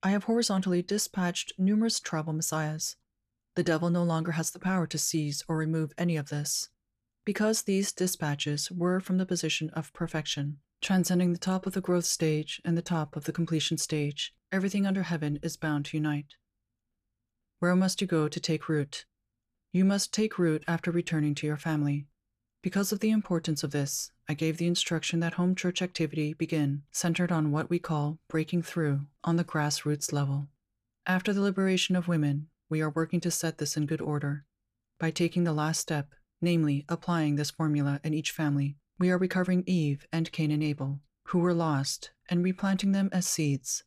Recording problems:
none

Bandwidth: 14.5 kHz